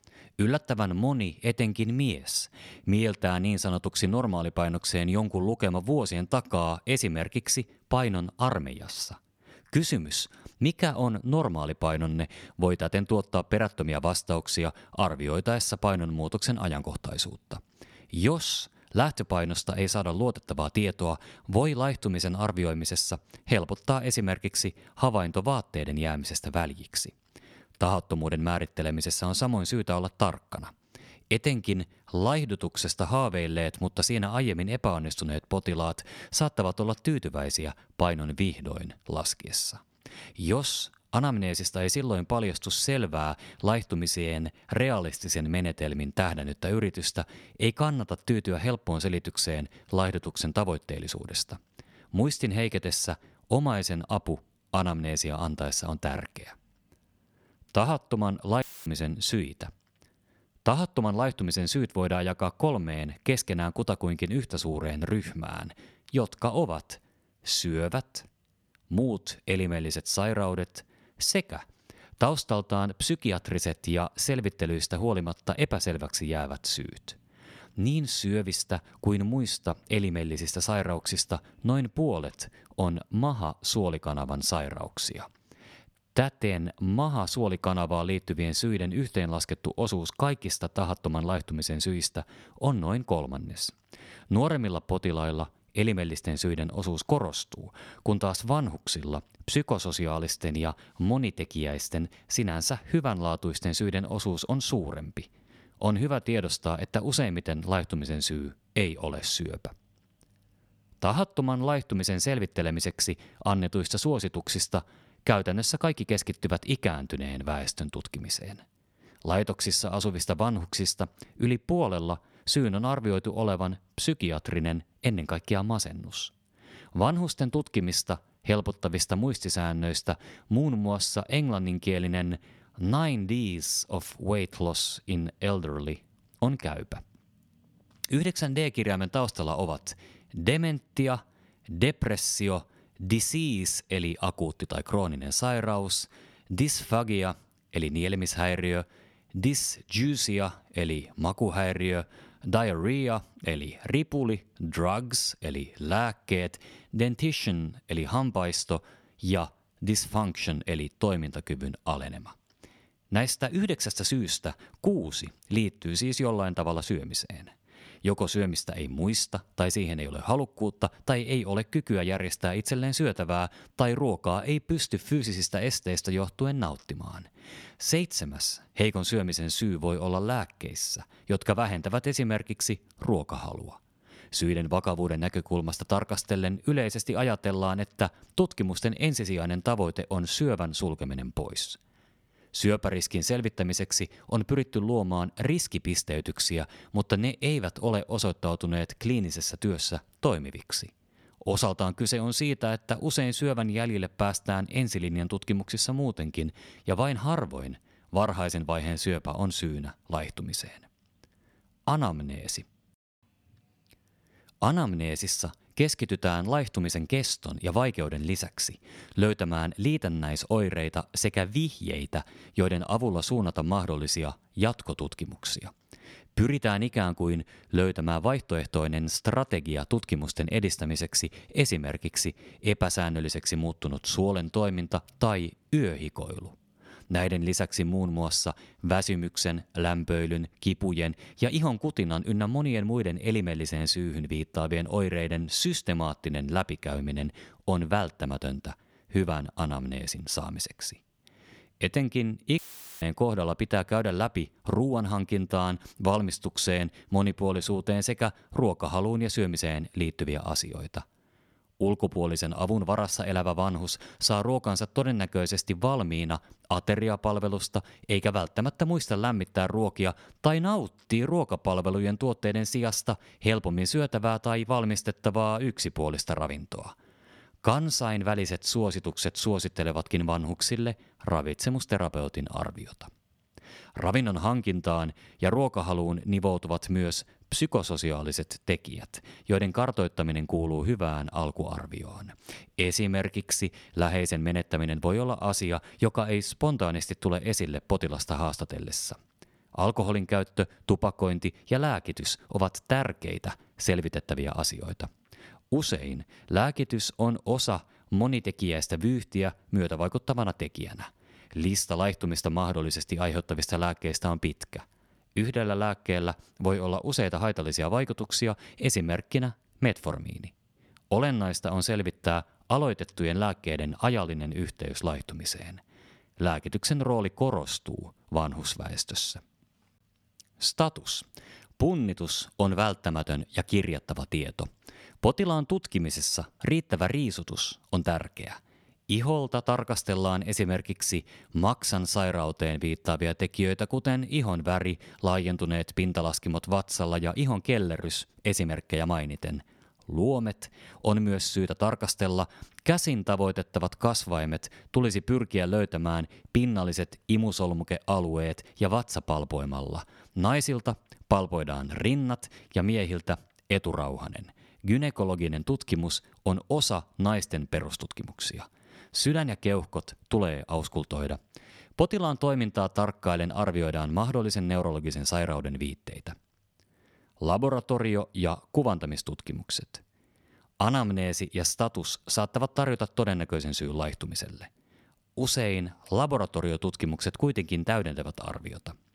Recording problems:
audio cutting out; filled with static; at 59 s and at 4:13

